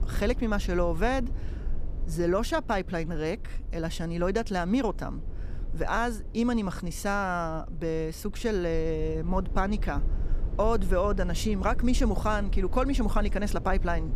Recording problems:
low rumble; faint; throughout; 20 dB below the speech

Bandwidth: 14.5 kHz